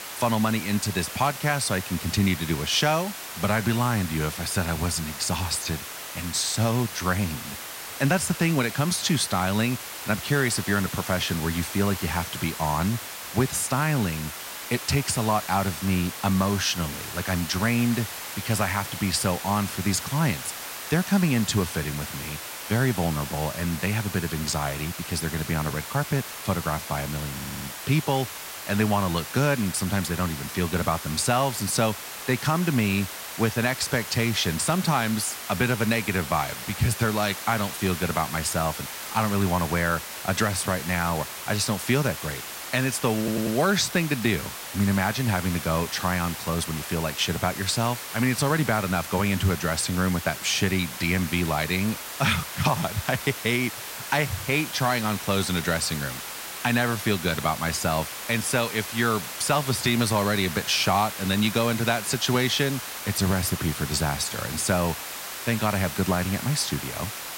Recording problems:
hiss; loud; throughout; 8 dB below the speech
audio stuttering; at 27 s and at 43 s

